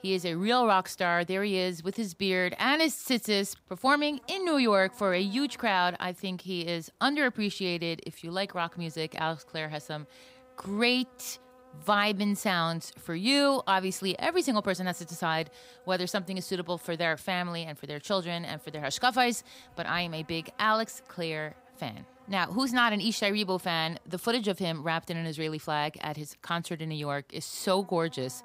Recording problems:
electrical hum; faint; throughout; 50 Hz, 30 dB below the speech

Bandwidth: 15.5 kHz